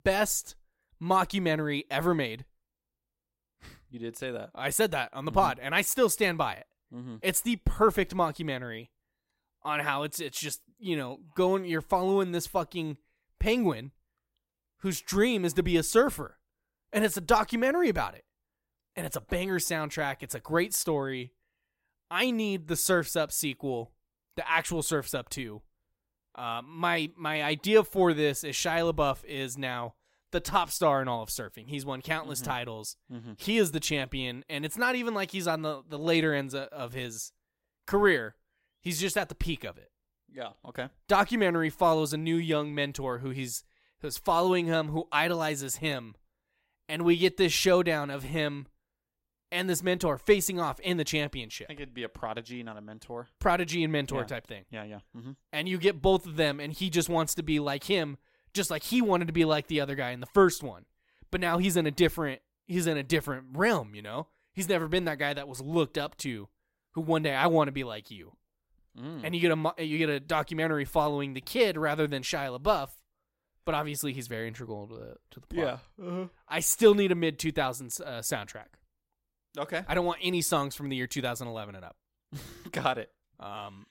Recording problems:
none

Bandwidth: 16 kHz